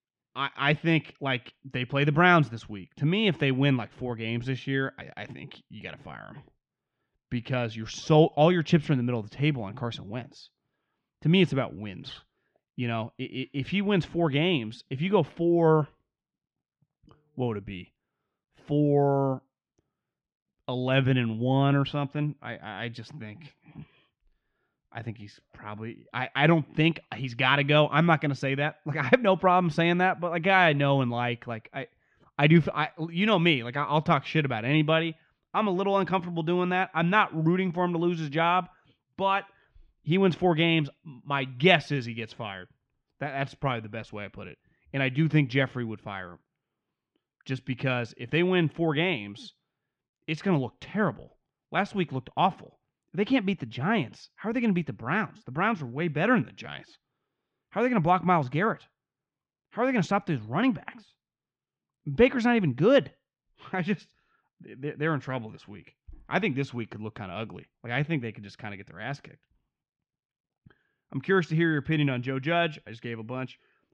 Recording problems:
muffled; slightly; fading above 4 kHz

